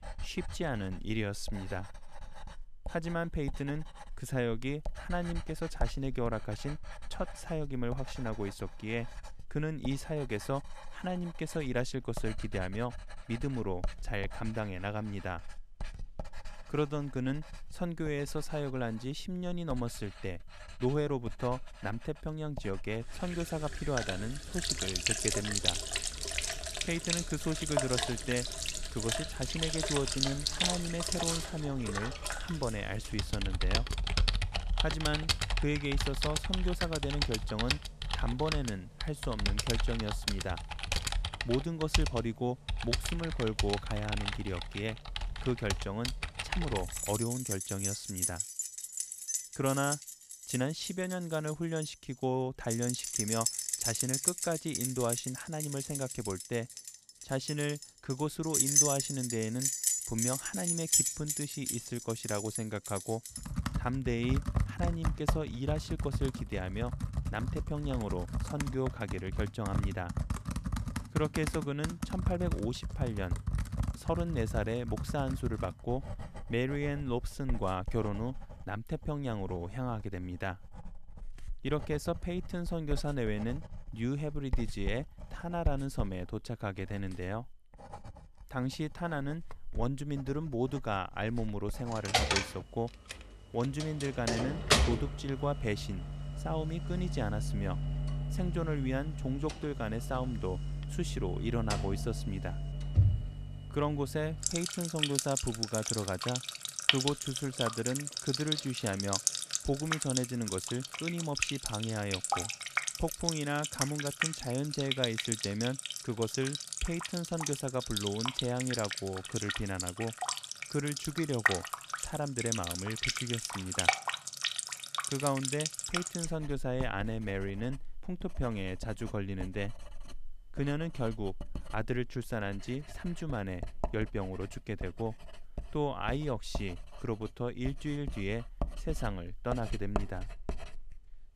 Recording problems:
household noises; very loud; throughout; 1 dB above the speech

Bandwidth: 14.5 kHz